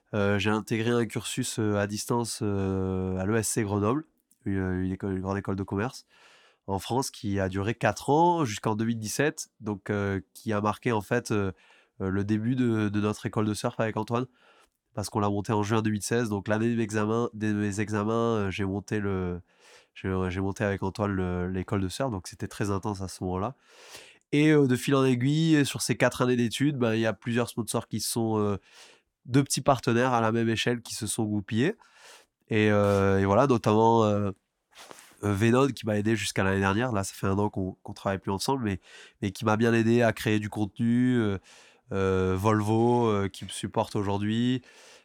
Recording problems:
none

